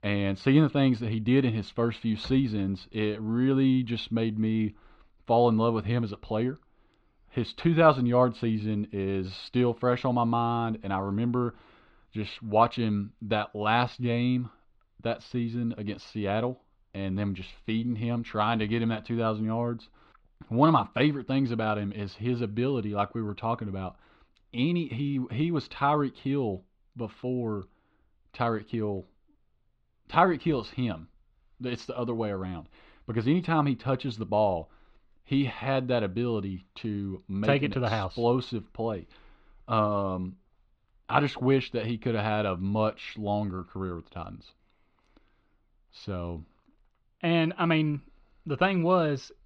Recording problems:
muffled; very slightly; fading above 3.5 kHz

